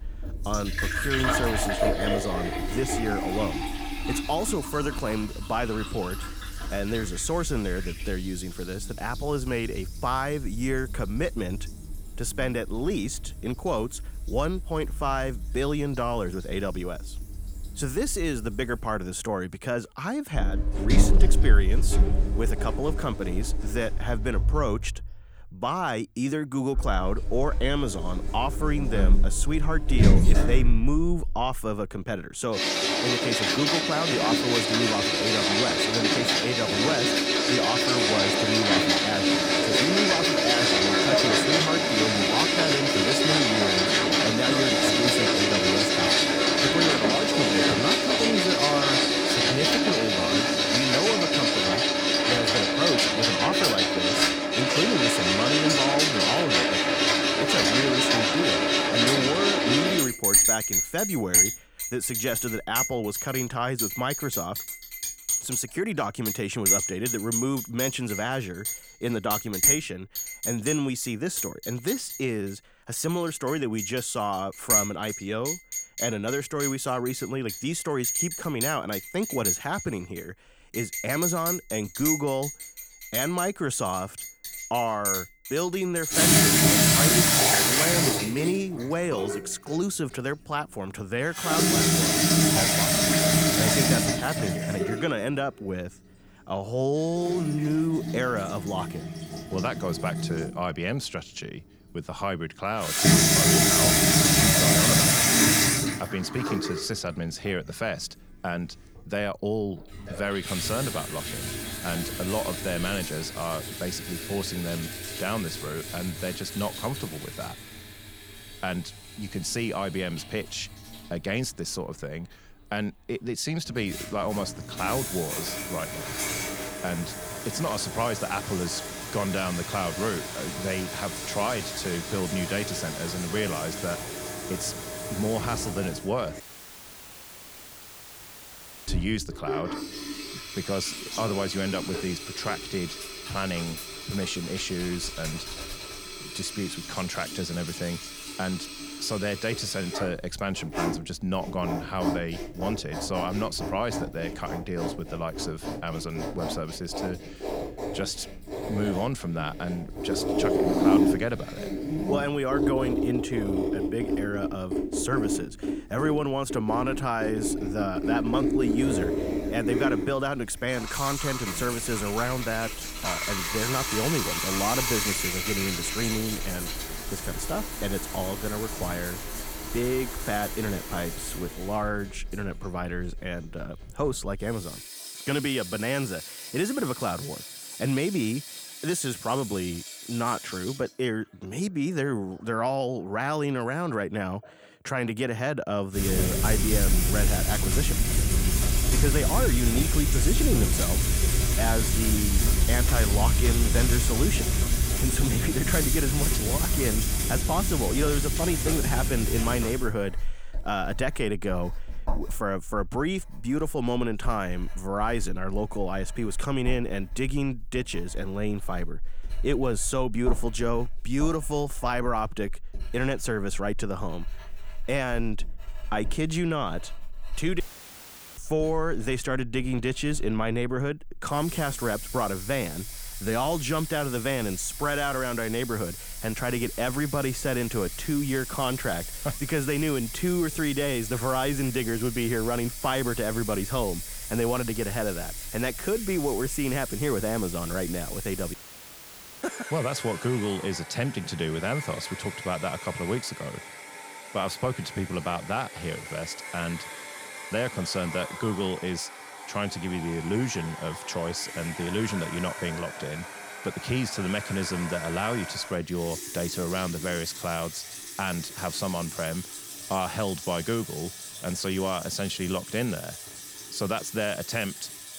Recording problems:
household noises; very loud; throughout; 4 dB above the speech
audio cutting out; at 2:16 for 2.5 s, at 3:48 for 1 s and at 4:09 for 1 s

